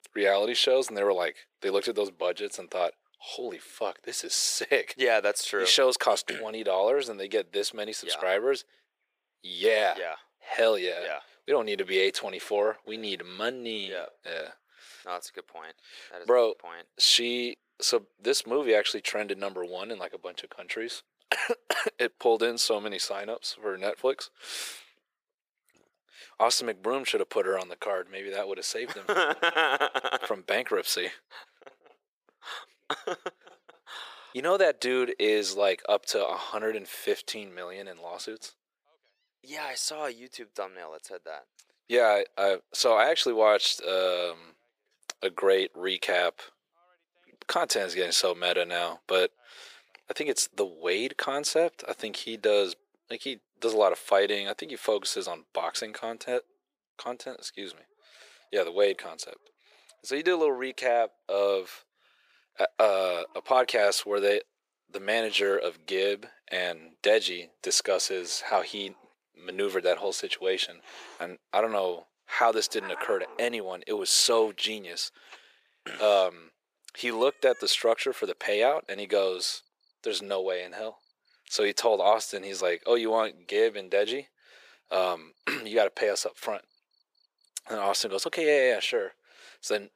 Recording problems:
thin; very; fading below 400 Hz
animal sounds; faint; throughout; 25 dB below the speech

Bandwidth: 15 kHz